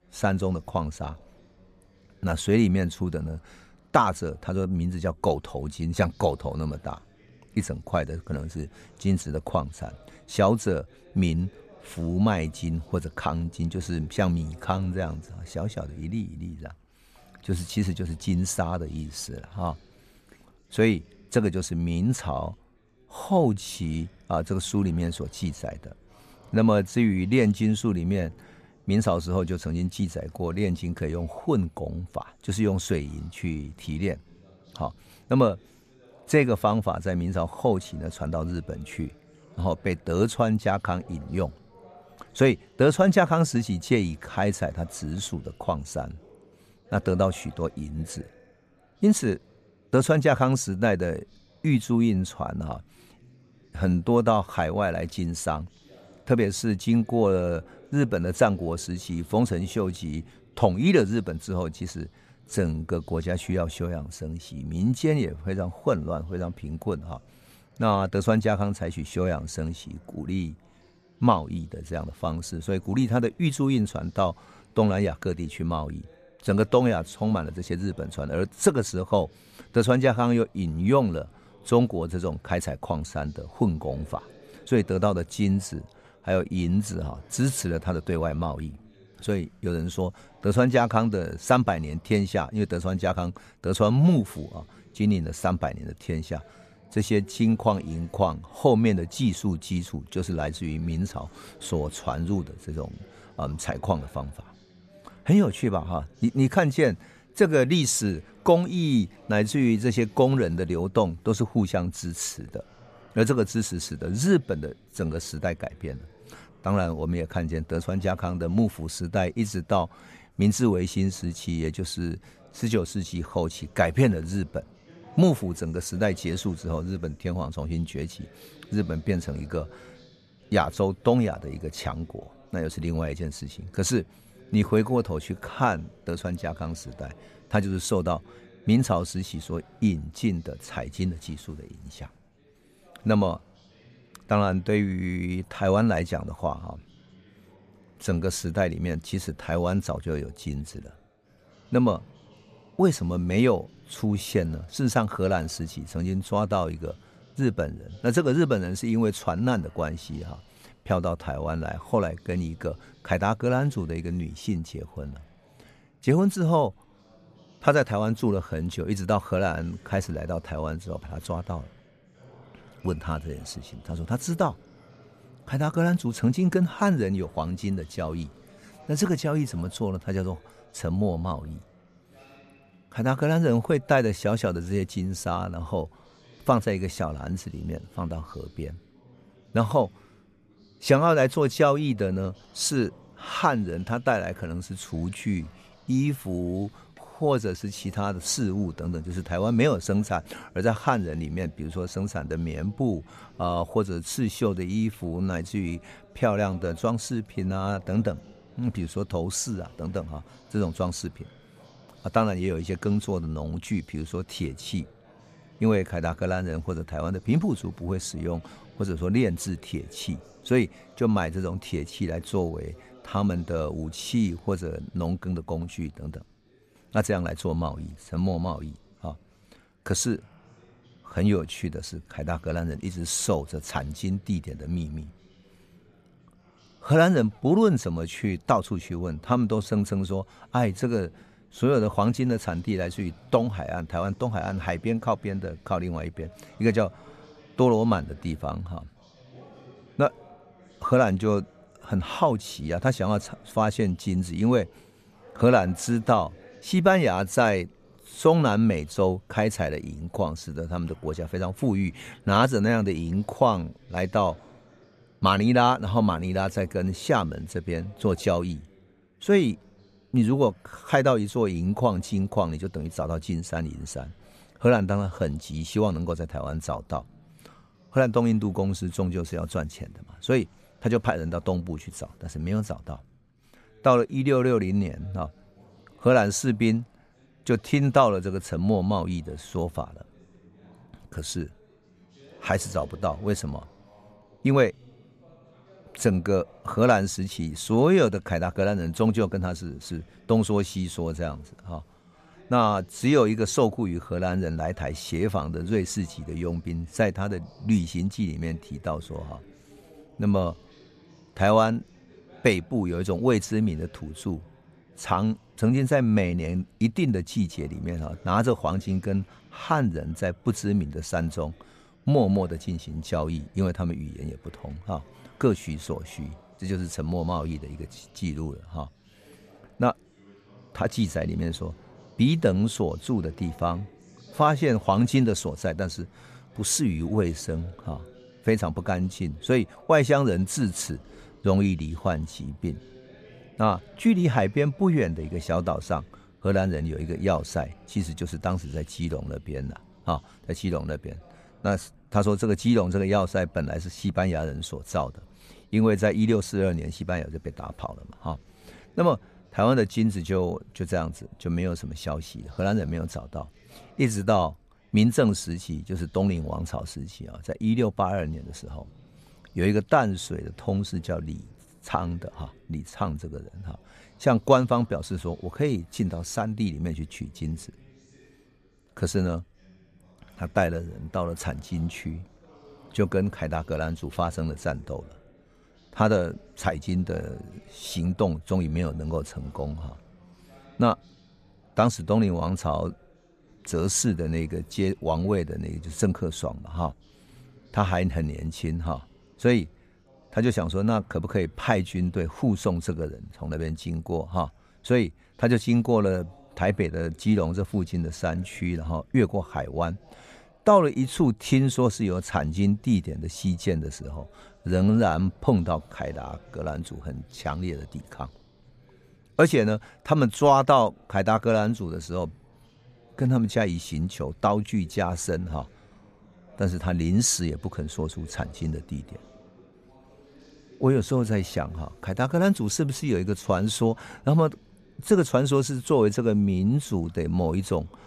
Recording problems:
background chatter; faint; throughout; 4 voices, 30 dB below the speech

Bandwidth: 14.5 kHz